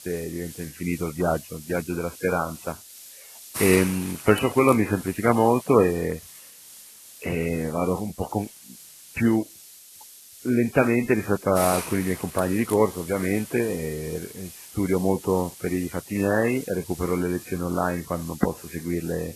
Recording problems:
garbled, watery; badly; nothing above 2.5 kHz
hiss; noticeable; throughout; 15 dB below the speech

